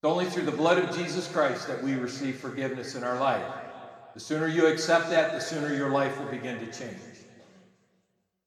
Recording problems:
room echo; noticeable; dies away in 1.8 s
off-mic speech; somewhat distant

